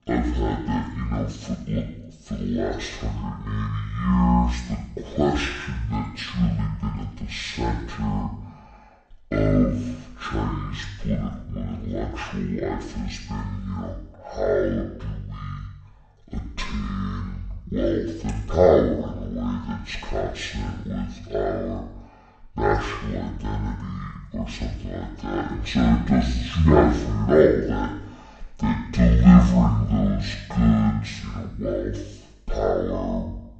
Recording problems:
wrong speed and pitch; too slow and too low; 0.5 times normal speed
room echo; slight; dies away in 0.8 s
off-mic speech; somewhat distant

